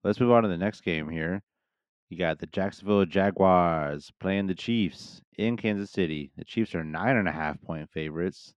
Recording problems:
muffled; slightly; fading above 3 kHz

